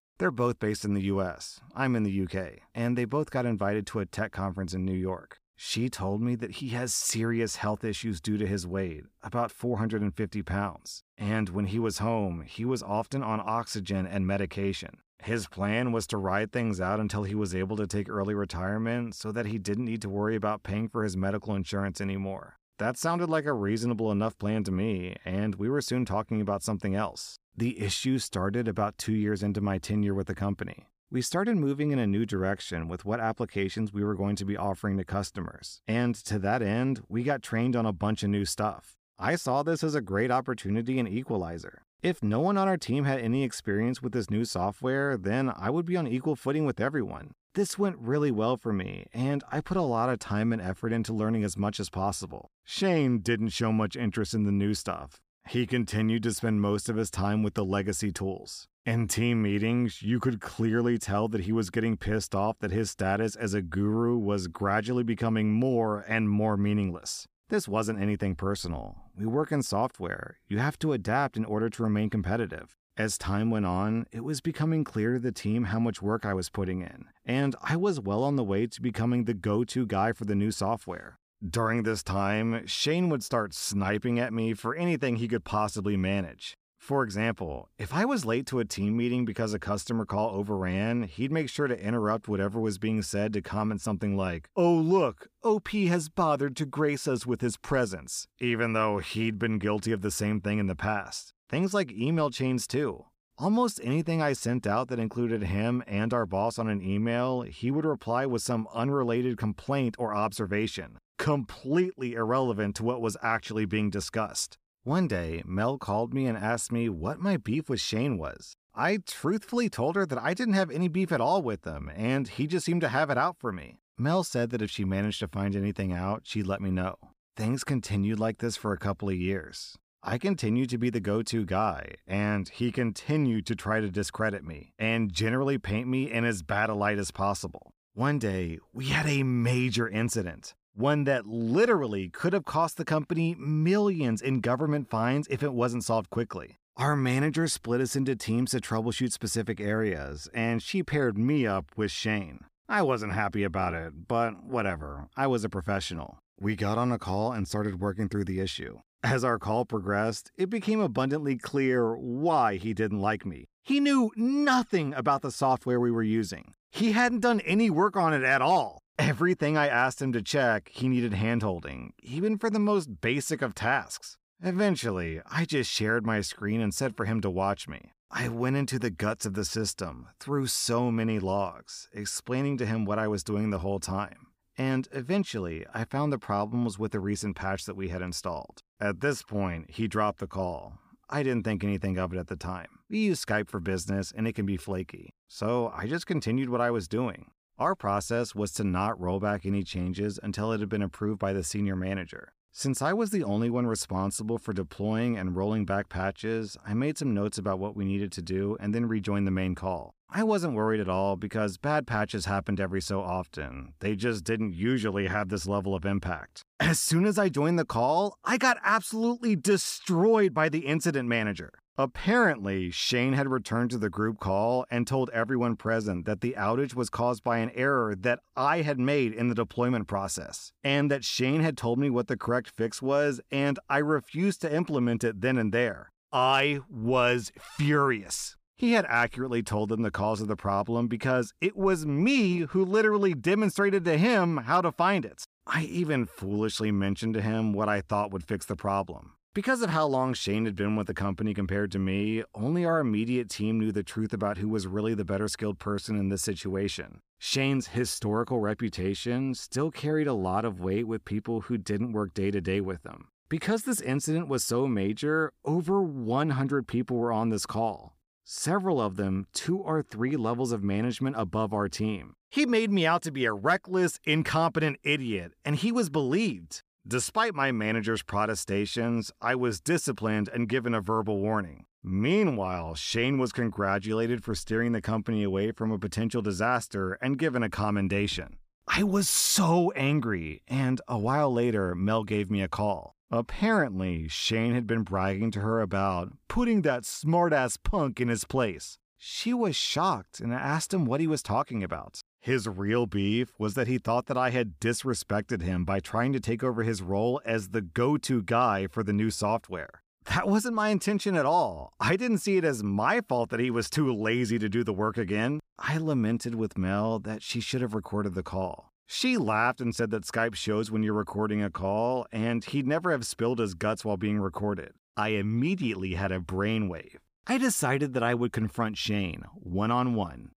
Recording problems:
none

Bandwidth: 15 kHz